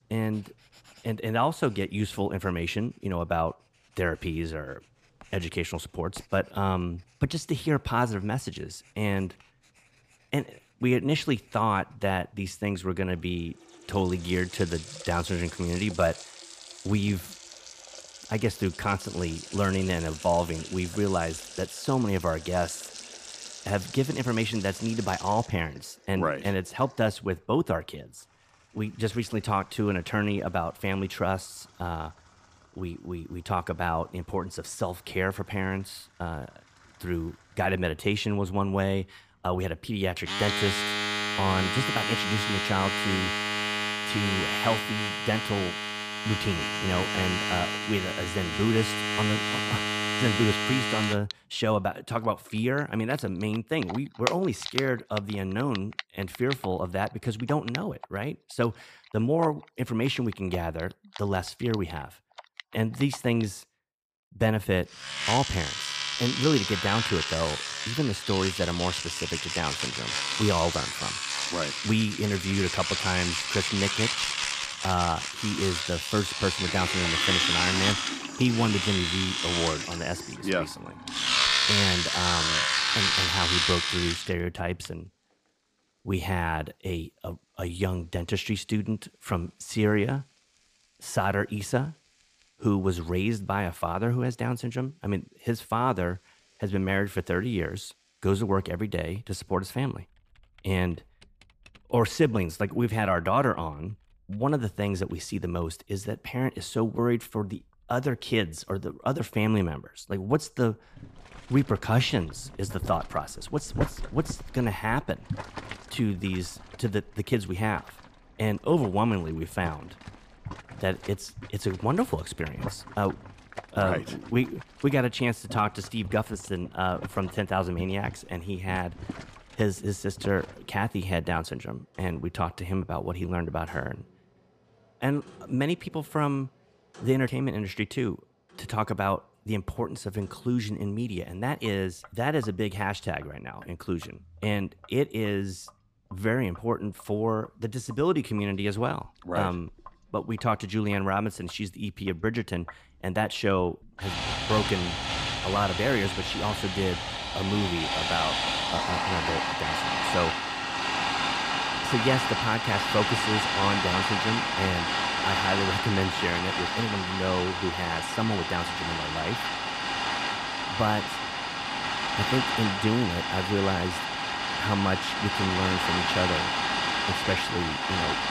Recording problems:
household noises; very loud; throughout; 1 dB above the speech

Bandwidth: 15 kHz